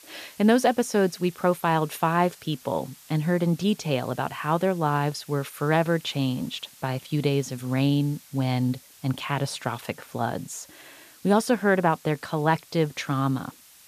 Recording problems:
hiss; faint; throughout; 25 dB below the speech

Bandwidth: 14.5 kHz